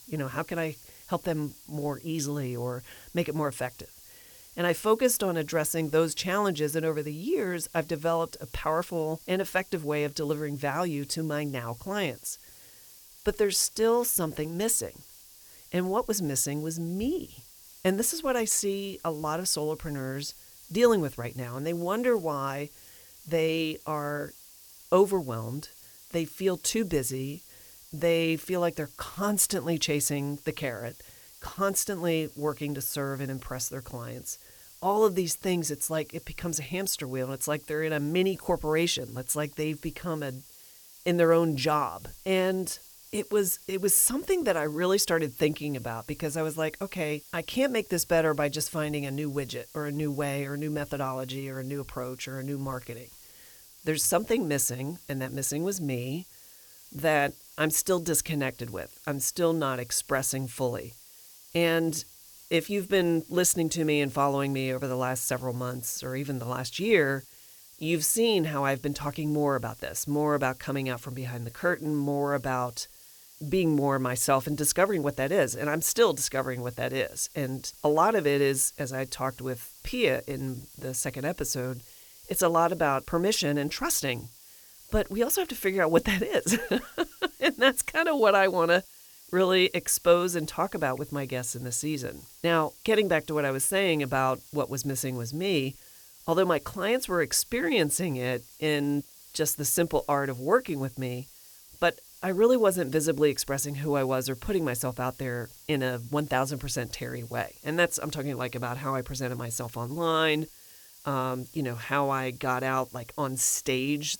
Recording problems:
hiss; faint; throughout; 20 dB below the speech

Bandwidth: 18.5 kHz